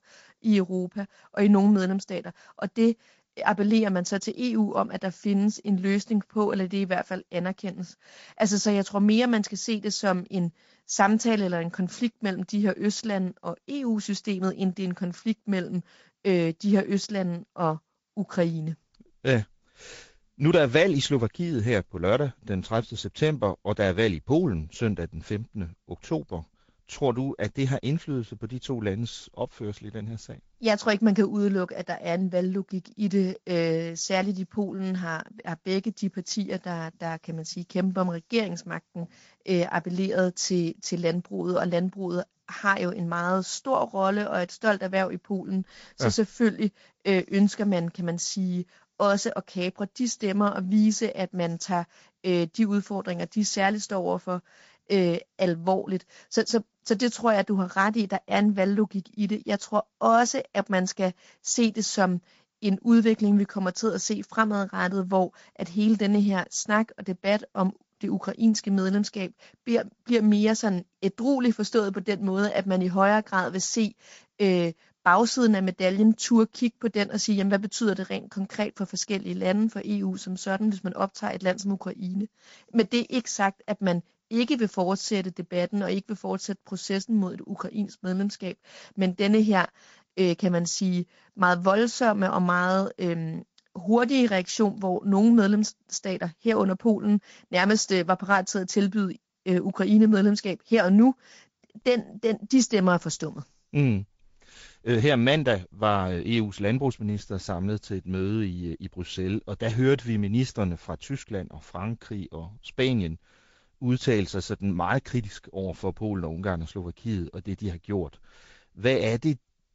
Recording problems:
garbled, watery; slightly; nothing above 7.5 kHz

